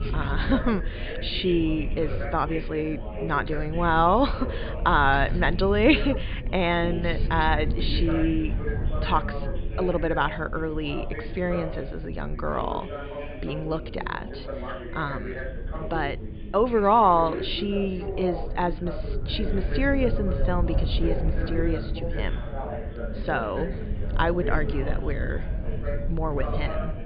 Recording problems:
high frequencies cut off; severe; nothing above 5 kHz
background chatter; noticeable; throughout; 2 voices, 10 dB below the speech
low rumble; faint; throughout; 20 dB below the speech

